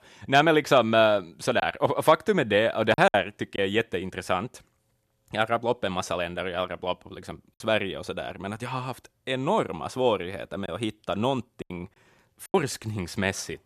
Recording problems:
choppy; very; from 1.5 to 3.5 s and from 11 to 13 s; 7% of the speech affected

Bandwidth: 13.5 kHz